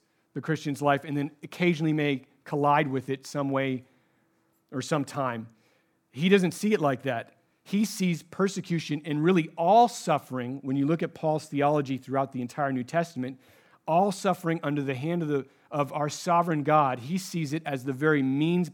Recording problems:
none

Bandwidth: 17.5 kHz